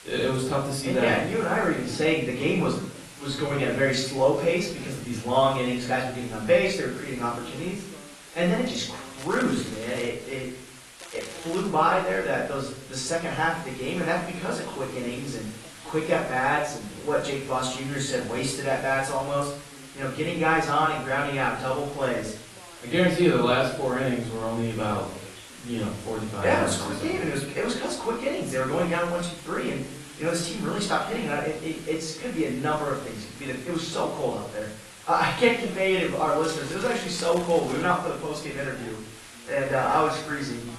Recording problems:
off-mic speech; far
room echo; noticeable; dies away in 0.5 s
garbled, watery; slightly; nothing above 11 kHz
hiss; noticeable; throughout; 15 dB below the speech
crackling; noticeable; at 9 s, at 11 s and from 36 to 38 s; 15 dB below the speech
voice in the background; faint; throughout; 25 dB below the speech

